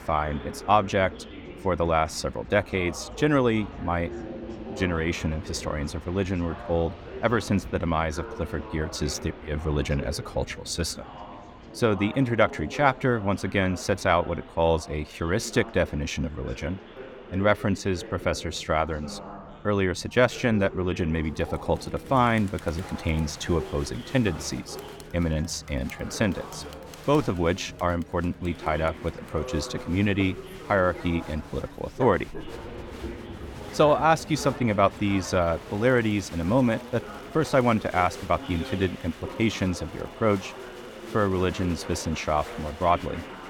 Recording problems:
chatter from many people; noticeable; throughout; 15 dB below the speech
train or aircraft noise; faint; throughout; 20 dB below the speech
dog barking; faint; from 29 to 34 s; peak 10 dB below the speech

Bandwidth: 17.5 kHz